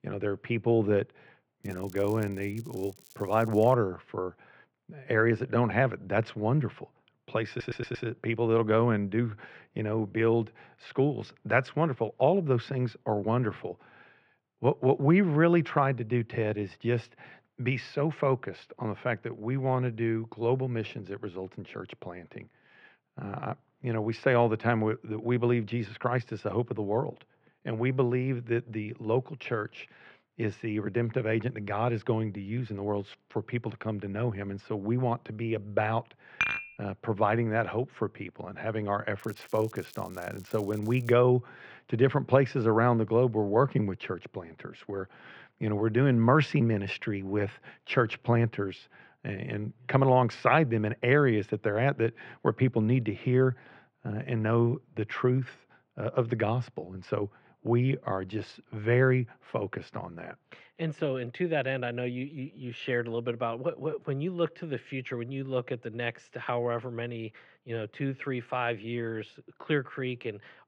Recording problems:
muffled; very; fading above 3.5 kHz
crackling; faint; from 1.5 to 3.5 s and from 39 to 41 s; 25 dB below the speech
audio stuttering; at 7.5 s
clattering dishes; loud; at 36 s; peak level with the speech

